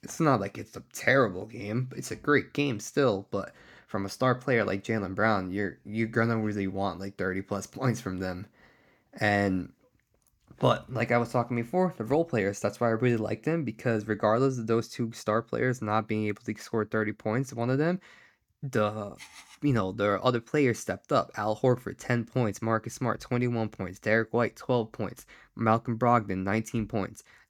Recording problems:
none

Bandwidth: 18 kHz